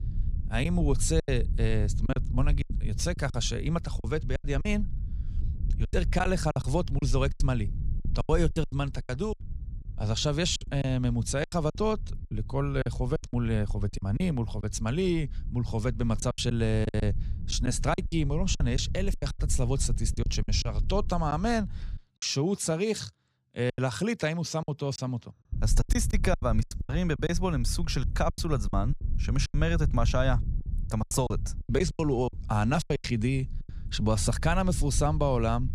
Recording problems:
low rumble; noticeable; until 22 s and from 26 s on; 20 dB below the speech
choppy; very; 12% of the speech affected

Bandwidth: 15 kHz